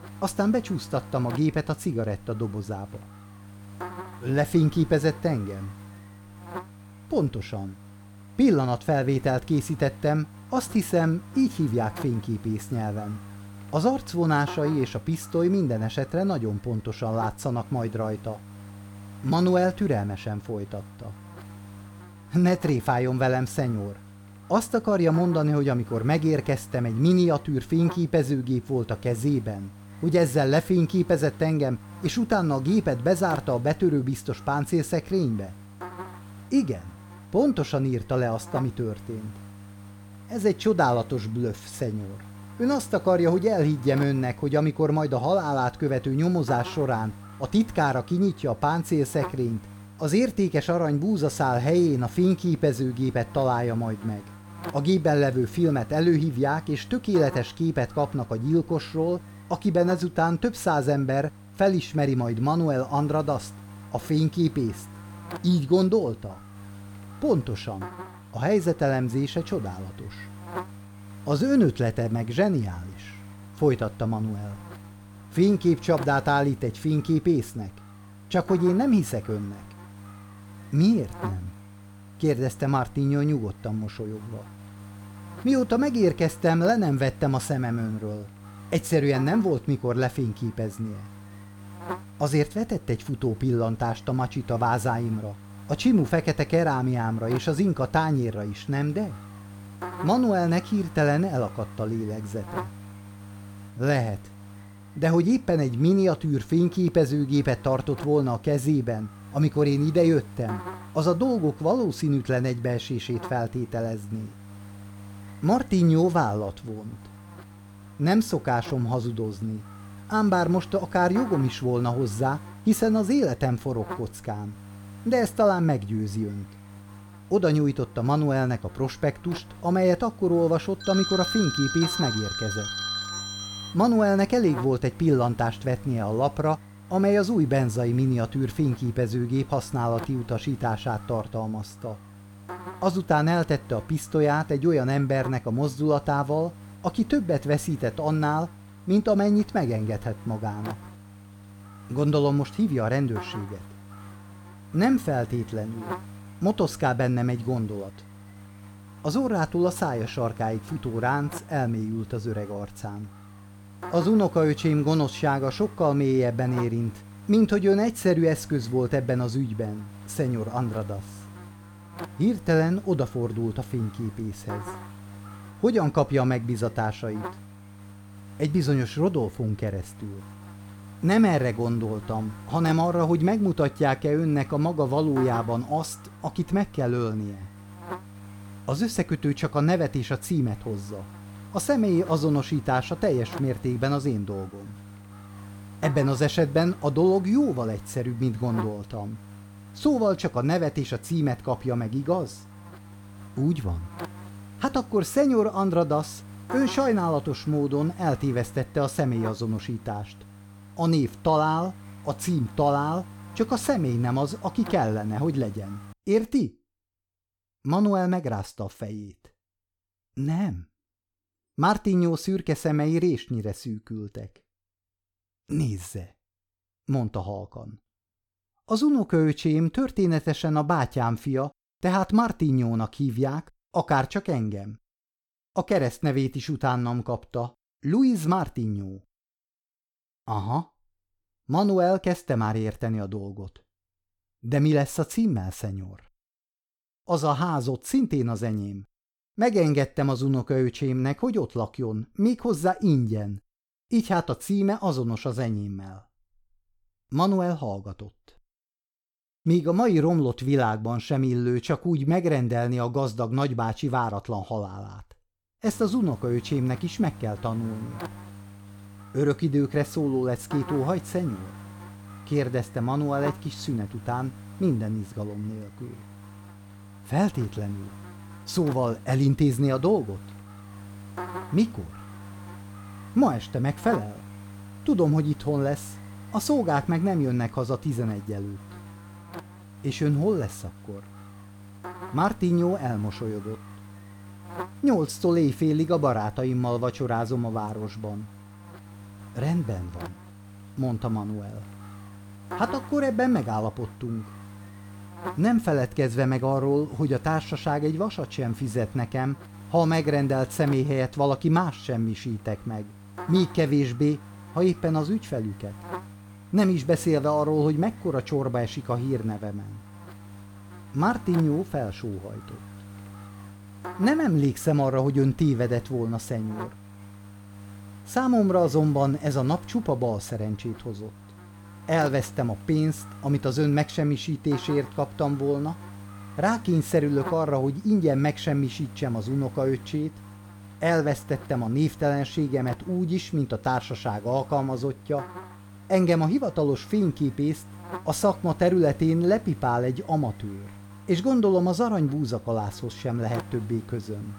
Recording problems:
electrical hum; noticeable; until 3:36 and from 4:26 on; 50 Hz, 20 dB below the speech
phone ringing; noticeable; from 2:11 to 2:14; peak 2 dB below the speech

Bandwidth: 18 kHz